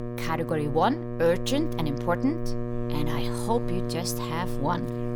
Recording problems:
electrical hum; loud; throughout; 60 Hz, 7 dB below the speech

